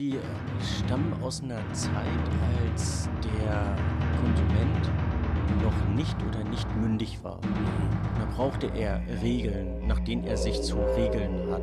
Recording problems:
background music; very loud; throughout; 4 dB above the speech
abrupt cut into speech; at the start

